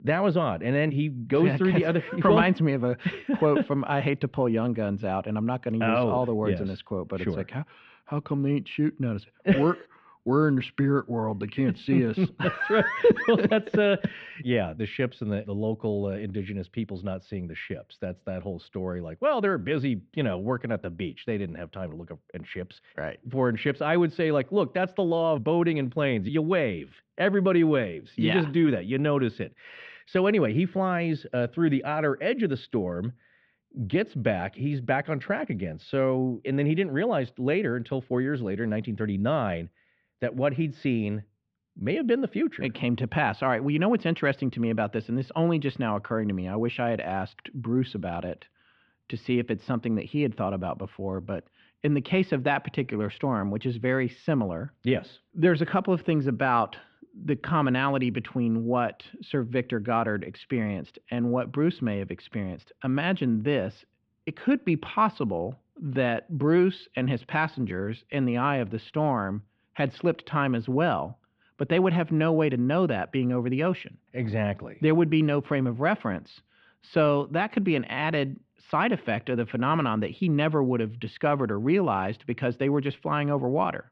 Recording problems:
muffled; slightly; fading above 3 kHz

